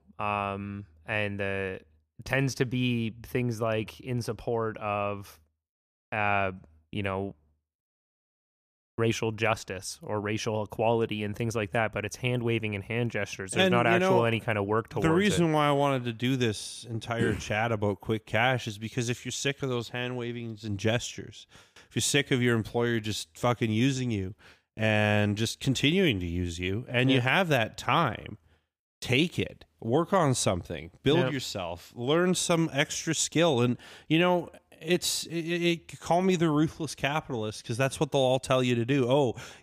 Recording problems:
none

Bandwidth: 15 kHz